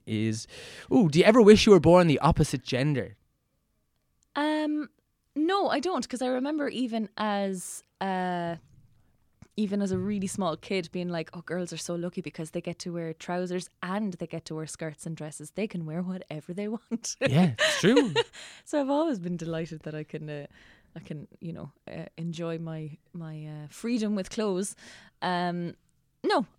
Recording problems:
none

